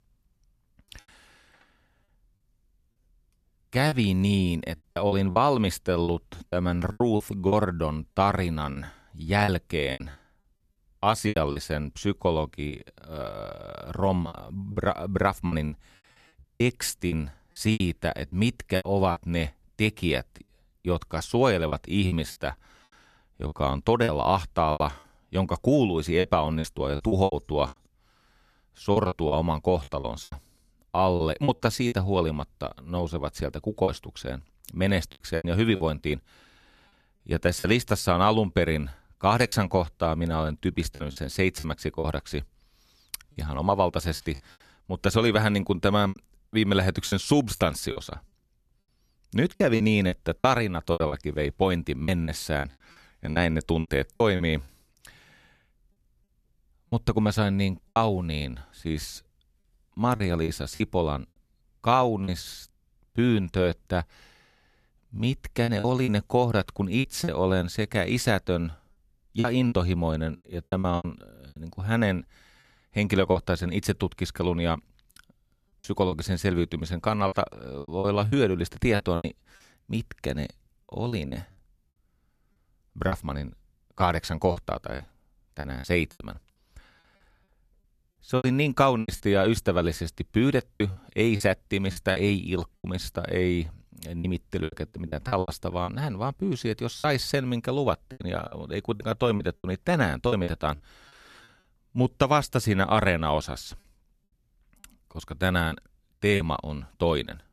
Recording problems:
choppy; very; 9% of the speech affected

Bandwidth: 14.5 kHz